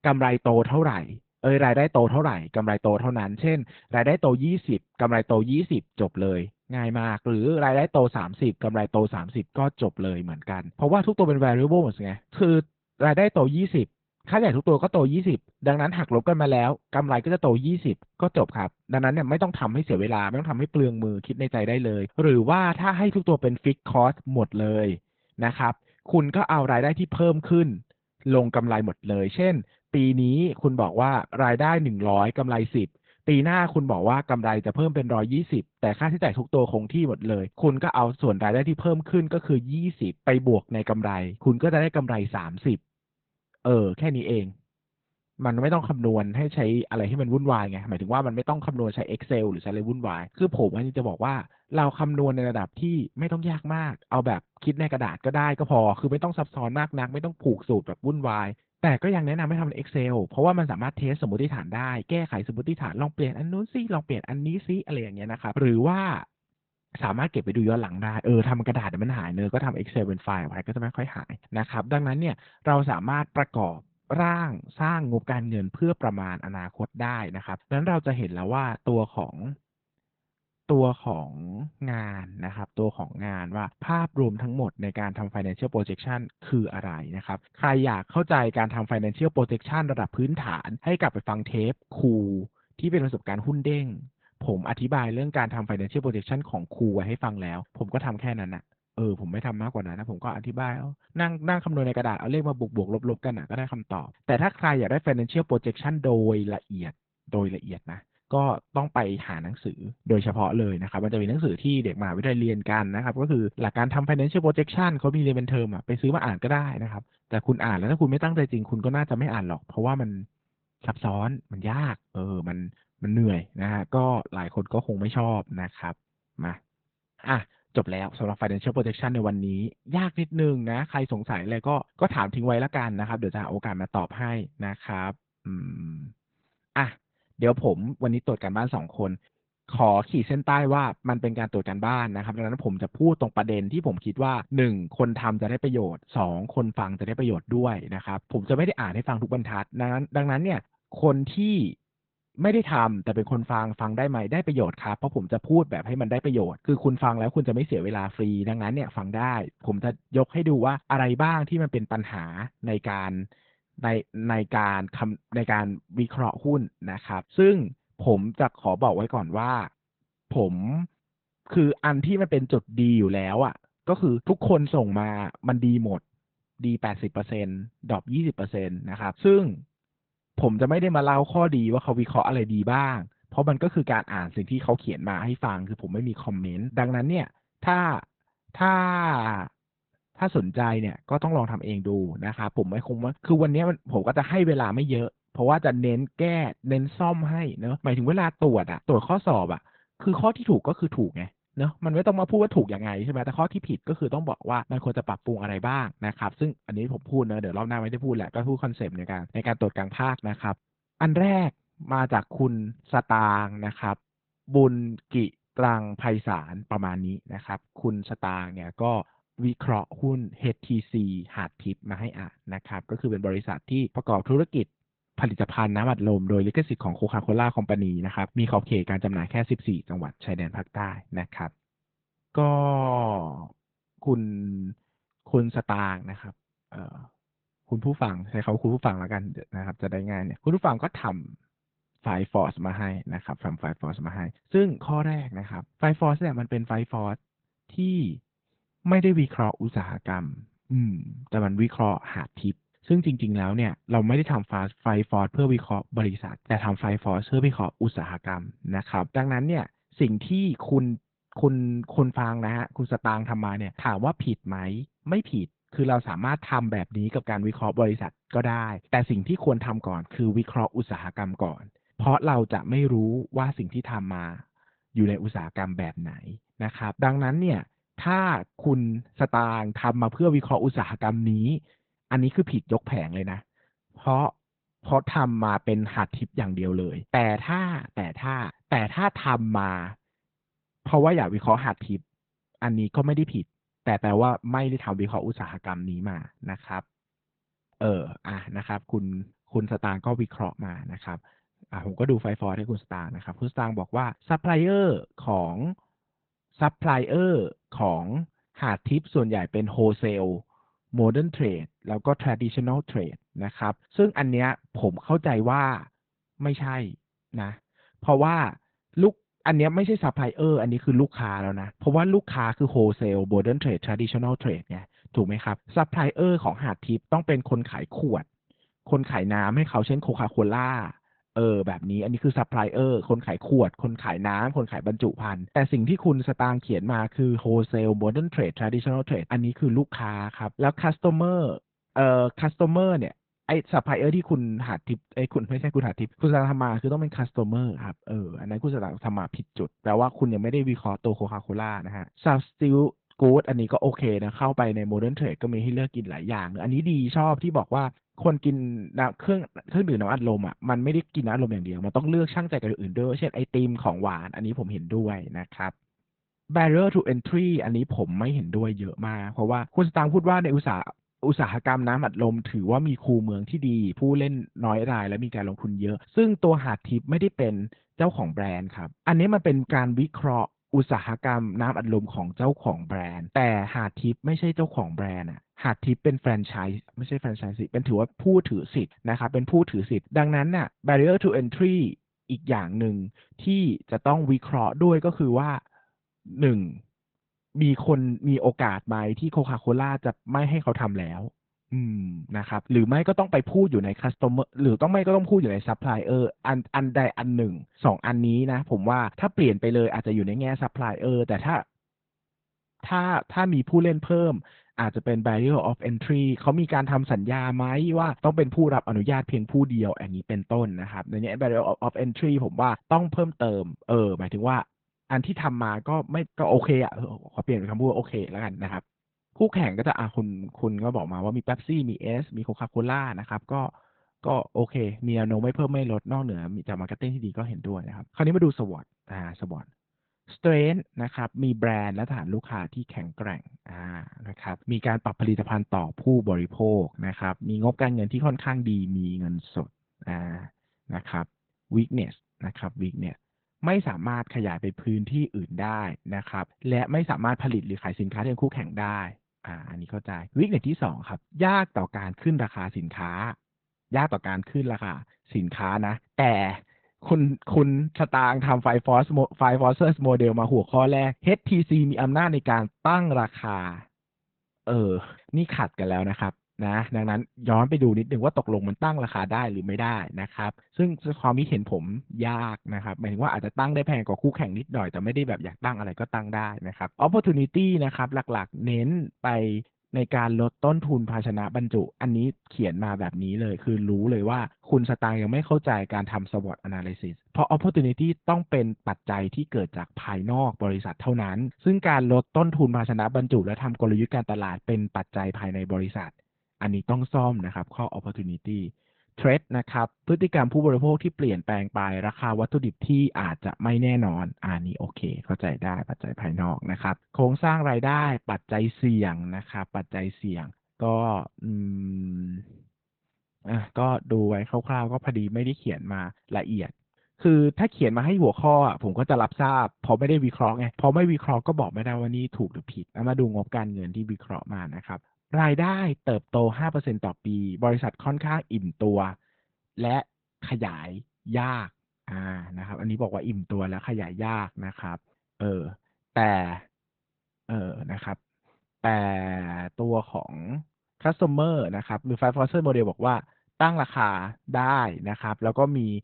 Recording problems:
garbled, watery; badly; nothing above 4 kHz

